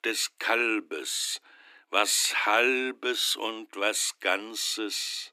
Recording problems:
thin; very; fading below 300 Hz

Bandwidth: 15 kHz